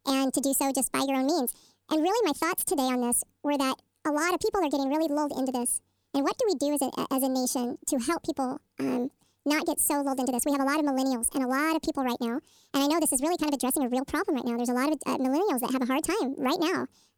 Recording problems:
wrong speed and pitch; too fast and too high; 1.6 times normal speed

